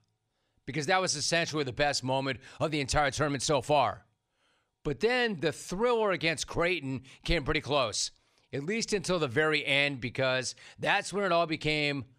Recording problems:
none

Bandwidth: 15 kHz